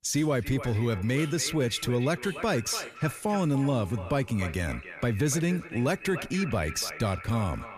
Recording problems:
echo of what is said; noticeable; throughout; 290 ms later, 10 dB below the speech
rain or running water; faint; throughout; 20 dB below the speech

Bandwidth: 14.5 kHz